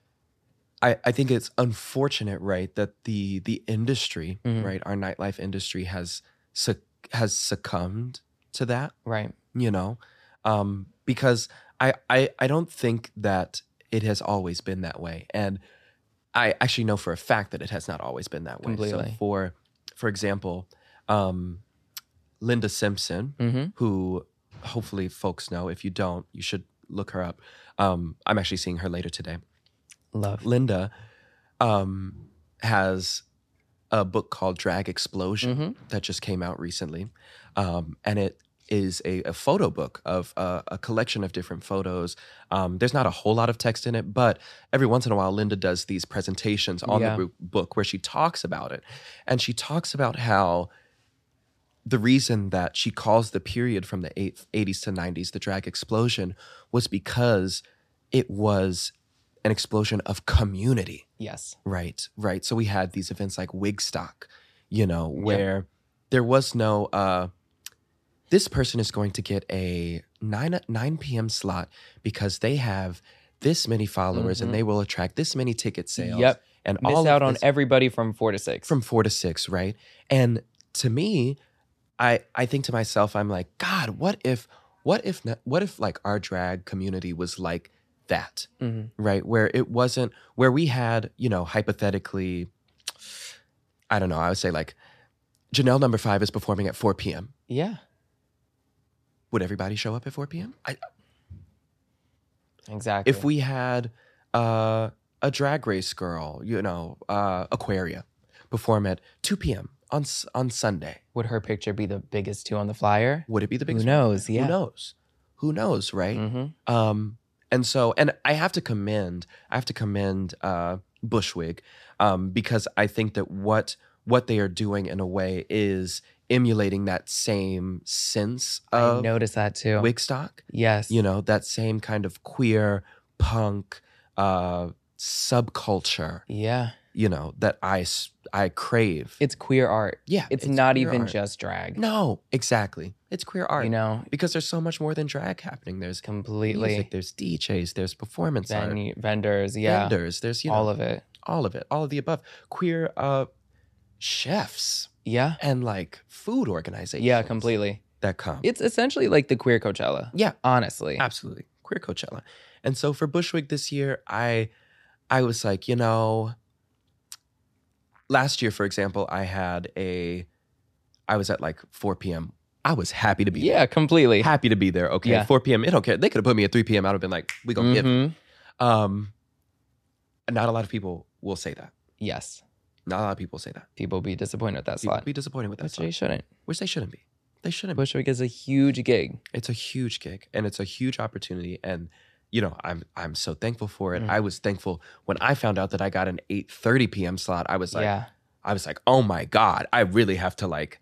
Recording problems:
none

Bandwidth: 14 kHz